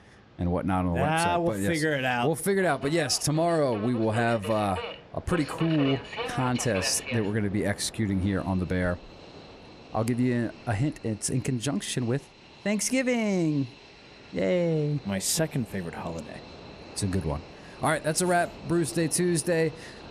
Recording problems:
train or aircraft noise; noticeable; throughout; 15 dB below the speech

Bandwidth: 14.5 kHz